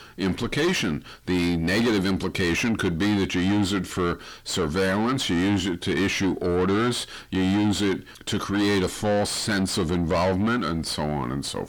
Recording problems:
distortion; heavy; 6 dB below the speech

